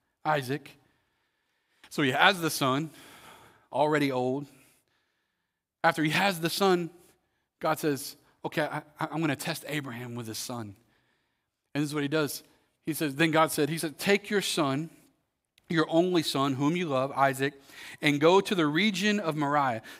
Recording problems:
none

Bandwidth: 15.5 kHz